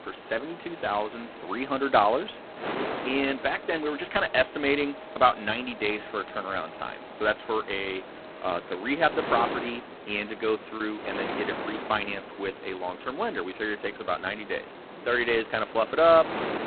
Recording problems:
phone-call audio; poor line; nothing above 4 kHz
traffic noise; noticeable; throughout; 20 dB below the speech
wind noise on the microphone; occasional gusts; 10 dB below the speech
choppy; occasionally; at 11 s; 2% of the speech affected

